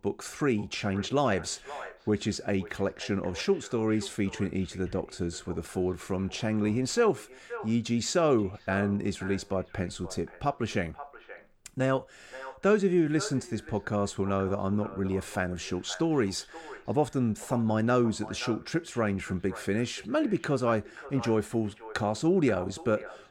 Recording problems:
echo of what is said; noticeable; throughout; 530 ms later, 15 dB below the speech

